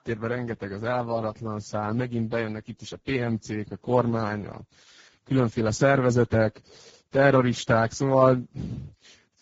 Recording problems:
garbled, watery; badly; nothing above 7.5 kHz

